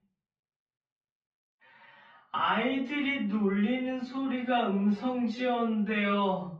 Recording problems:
off-mic speech; far
muffled; very; fading above 3.5 kHz
wrong speed, natural pitch; too slow; 0.5 times normal speed
room echo; slight; dies away in 0.5 s

